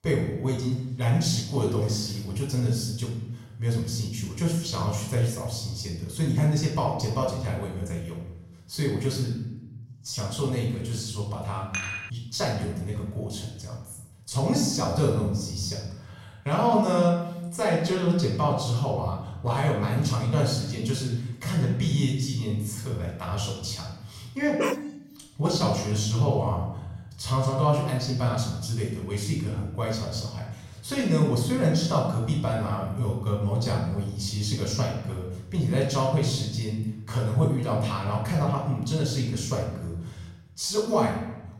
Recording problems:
off-mic speech; far
room echo; noticeable; dies away in 0.8 s
clattering dishes; noticeable; at 12 s; peak 4 dB below the speech
dog barking; noticeable; at 25 s; peak 2 dB below the speech

